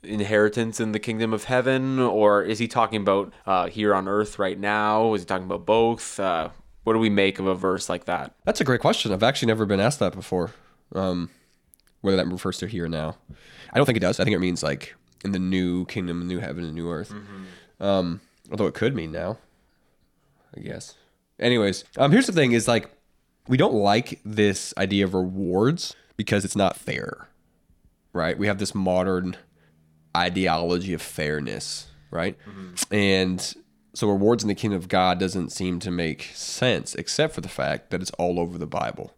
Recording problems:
uneven, jittery; strongly; from 3.5 to 34 s

